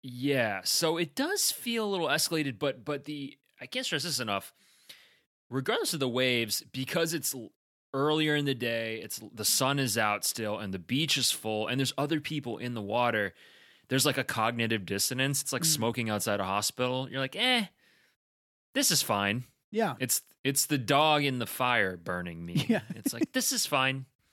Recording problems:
none

